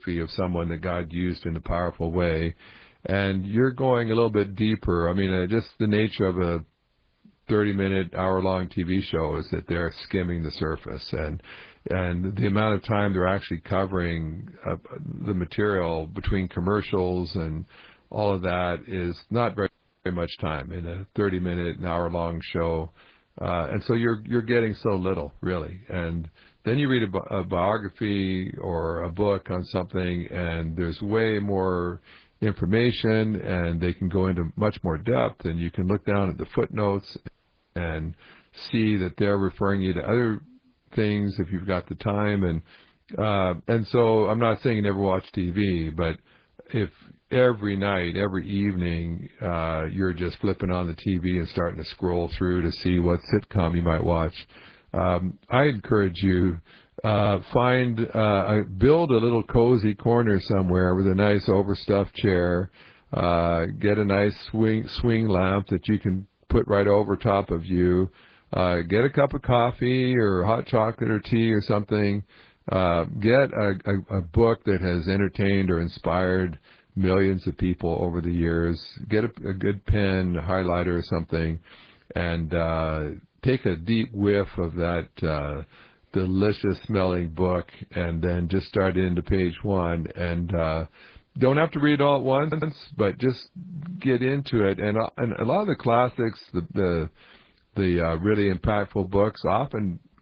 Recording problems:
garbled, watery; badly
audio cutting out; at 20 s and at 37 s
audio stuttering; at 57 s and at 1:32

